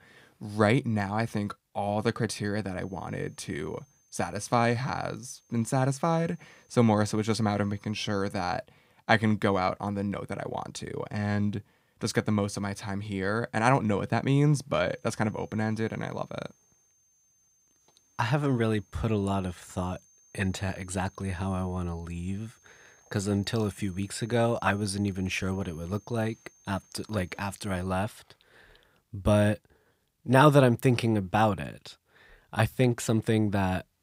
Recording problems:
high-pitched whine; faint; from 3 to 8.5 s and from 15 to 28 s; 6.5 kHz, 35 dB below the speech

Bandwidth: 15.5 kHz